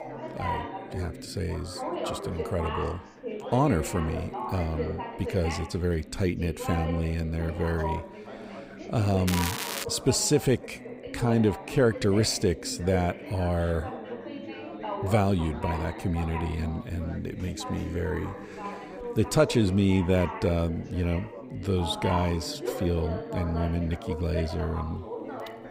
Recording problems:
background chatter; loud; throughout; 3 voices, 9 dB below the speech
crackling; loud; at 9.5 s; 5 dB below the speech

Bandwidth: 15.5 kHz